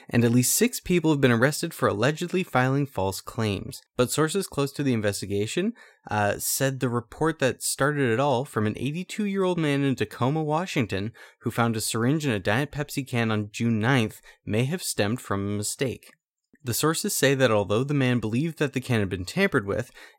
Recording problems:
none

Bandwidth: 16 kHz